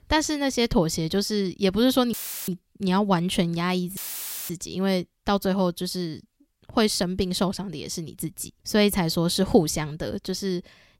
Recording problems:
audio cutting out; filled with static; at 2 s and at 4 s for 0.5 s

